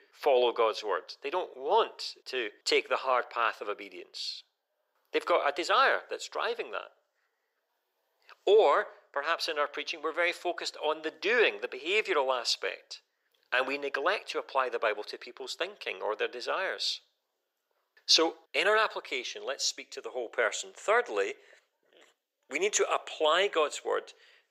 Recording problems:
thin; very; fading below 400 Hz

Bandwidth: 15.5 kHz